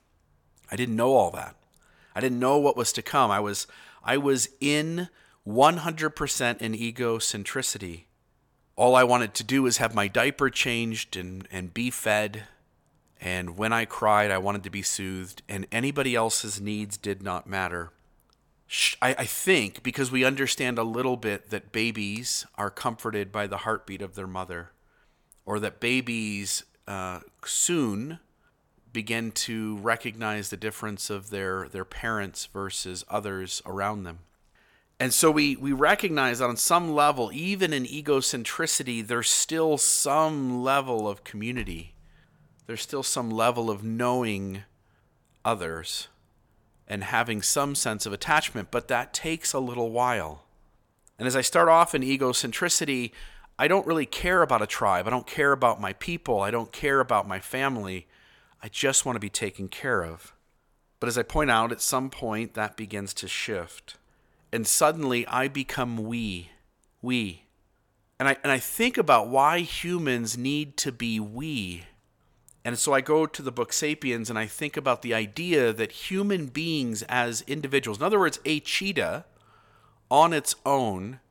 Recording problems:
none

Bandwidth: 17.5 kHz